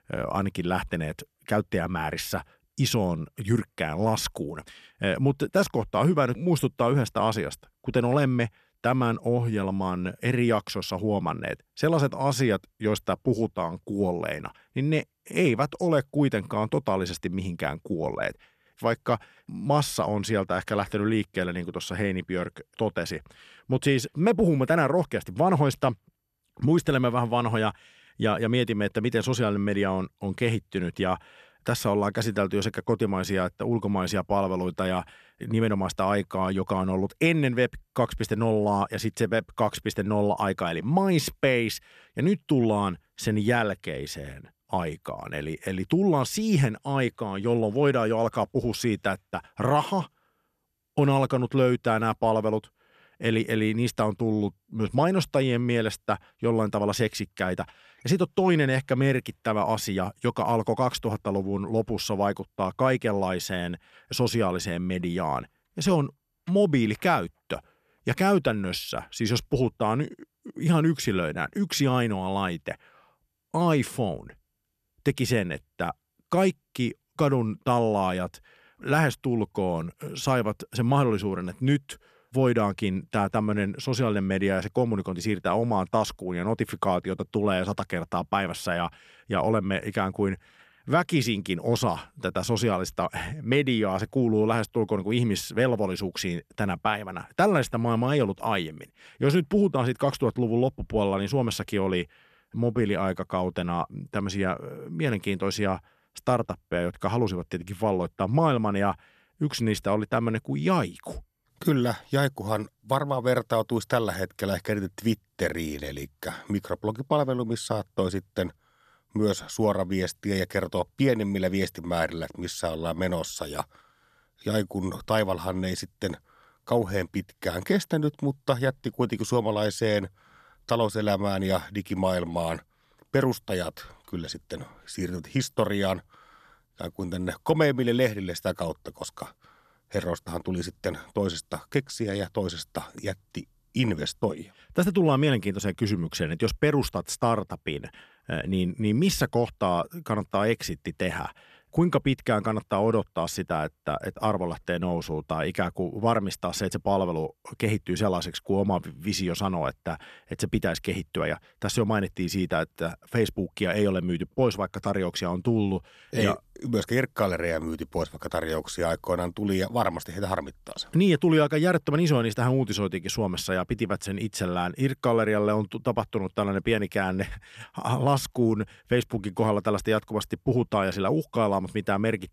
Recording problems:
none

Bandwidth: 14 kHz